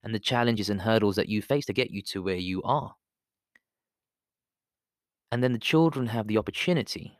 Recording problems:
uneven, jittery; strongly; from 0.5 to 6.5 s

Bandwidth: 14.5 kHz